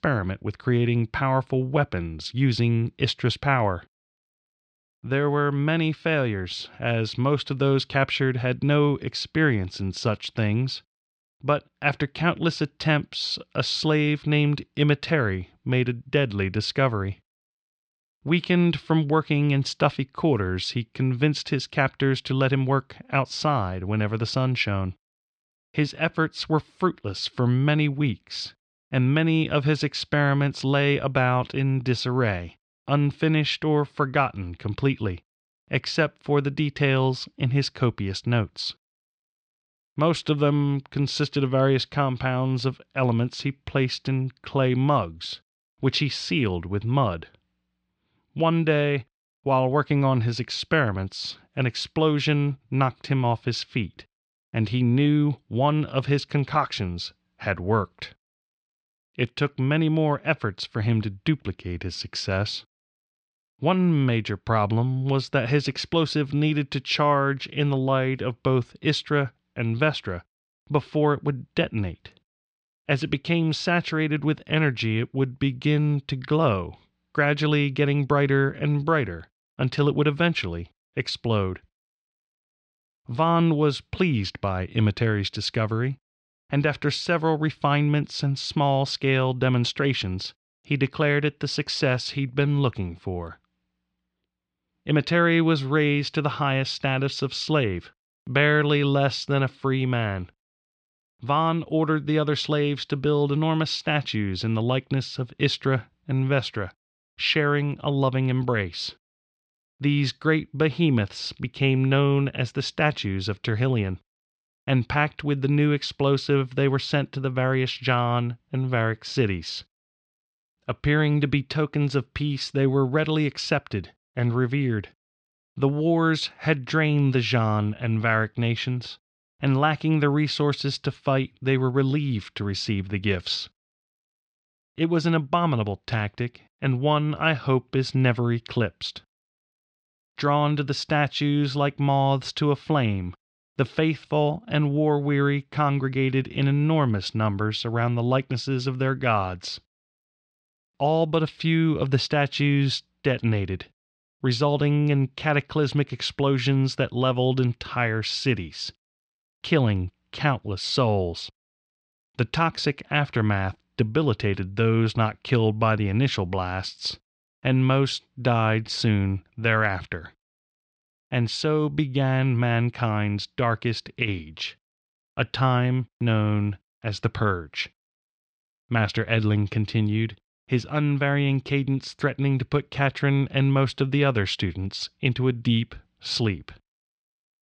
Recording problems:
muffled; very slightly; fading above 4 kHz

